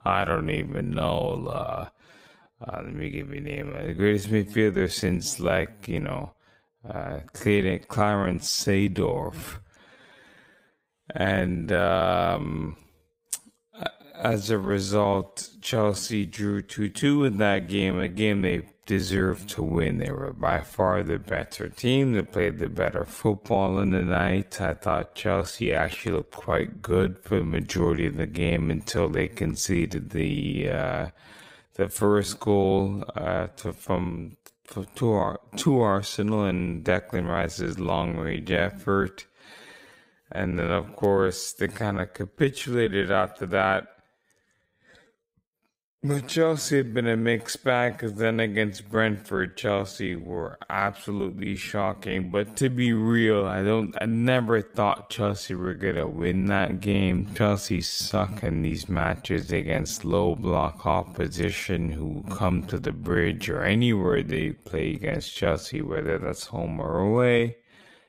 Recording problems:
wrong speed, natural pitch; too slow; 0.6 times normal speed

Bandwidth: 15.5 kHz